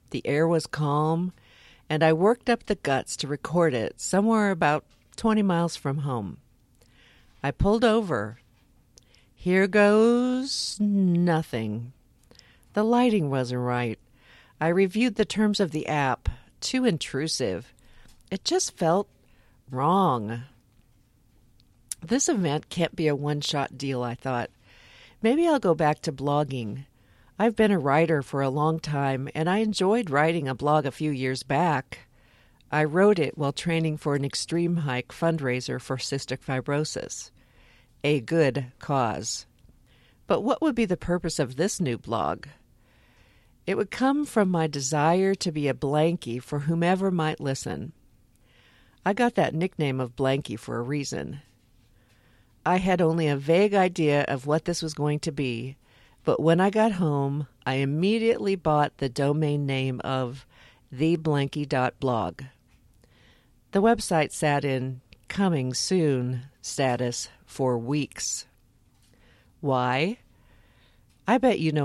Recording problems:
abrupt cut into speech; at the end

